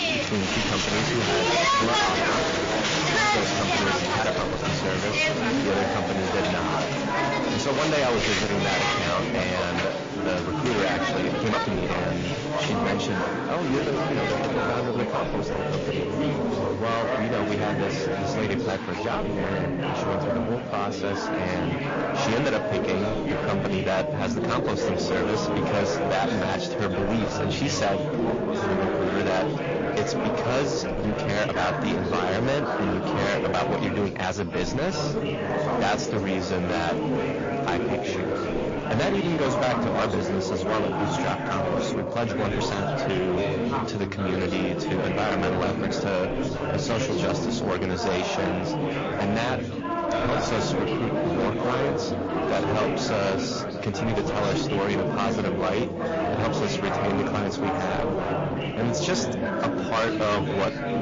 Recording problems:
distortion; heavy; 20% of the sound clipped
garbled, watery; slightly; nothing above 6.5 kHz
chatter from many people; very loud; throughout; 1 dB above the speech
uneven, jittery; strongly; from 4 to 54 s

